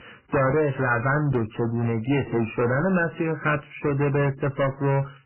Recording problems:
distortion; heavy; 15% of the sound clipped
garbled, watery; badly; nothing above 3 kHz

